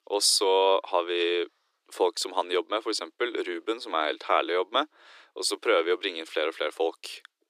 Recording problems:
thin; very; fading below 300 Hz

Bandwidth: 14.5 kHz